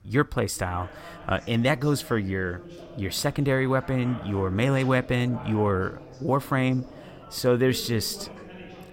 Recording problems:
background chatter; noticeable; throughout; 3 voices, 15 dB below the speech

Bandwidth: 16 kHz